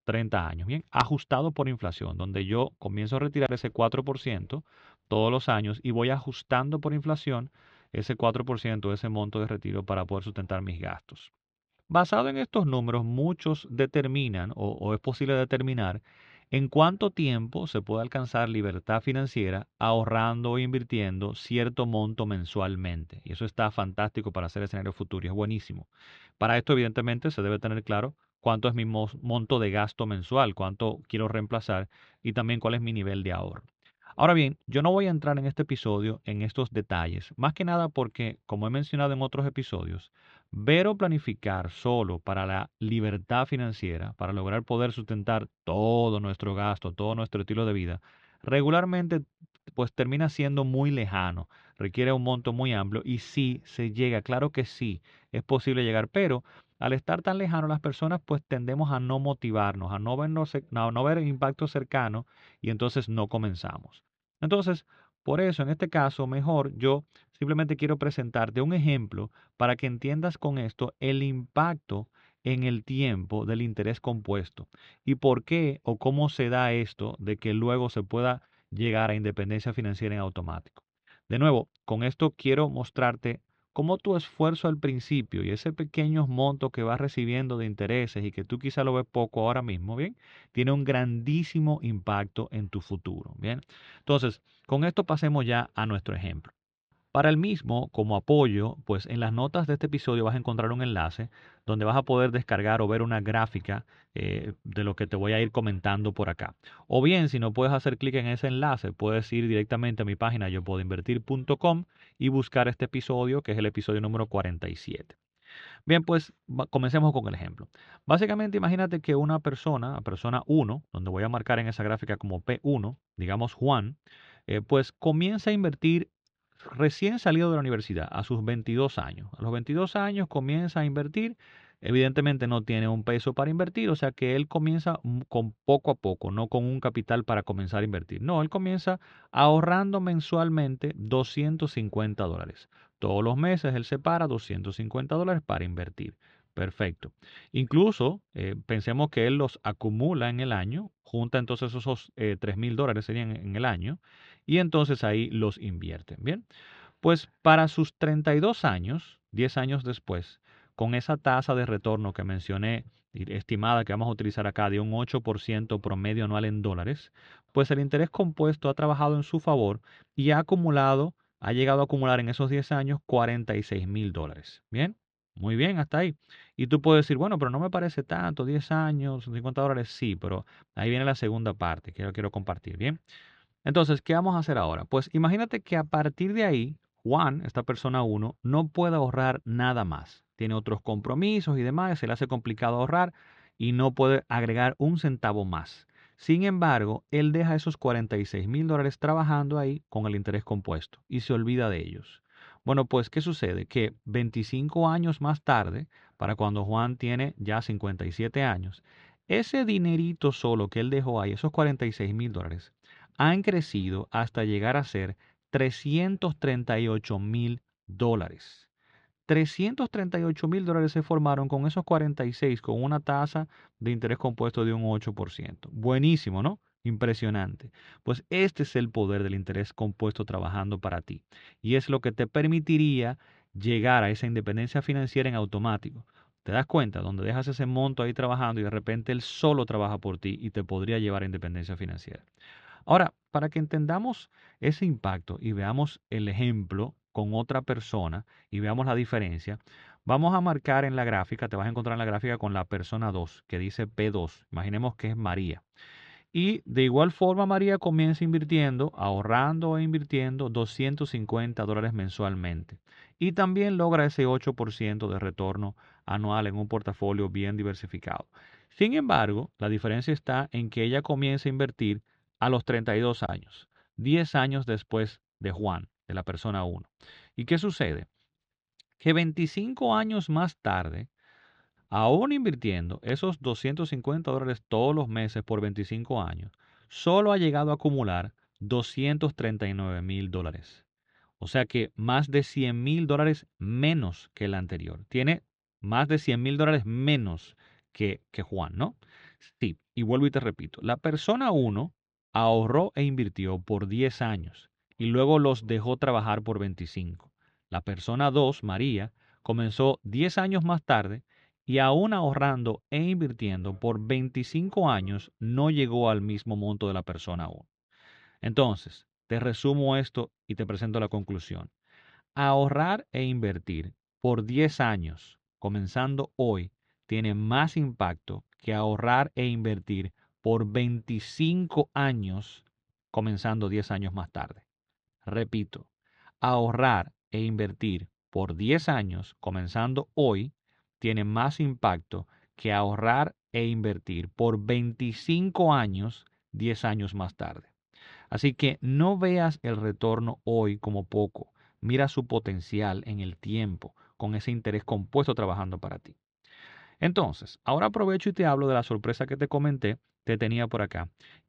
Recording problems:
muffled; slightly; fading above 4 kHz

